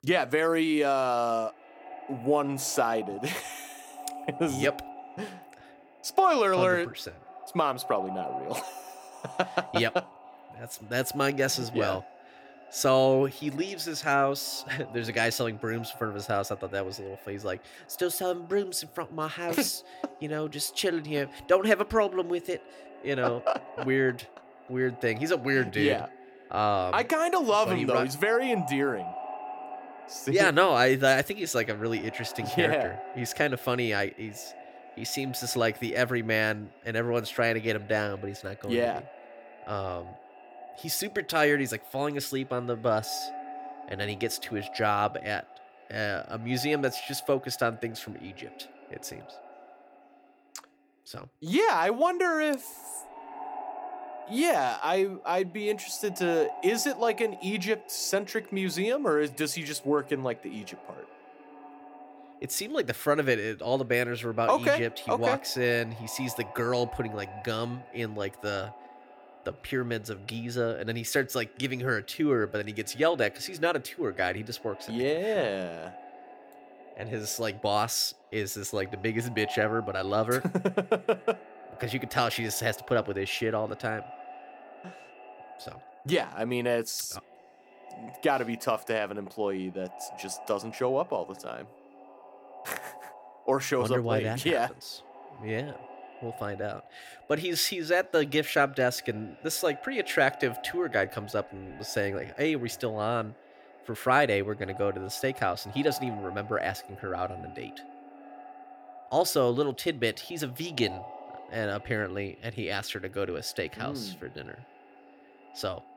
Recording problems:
echo of what is said; noticeable; throughout; 480 ms later, 15 dB below the speech

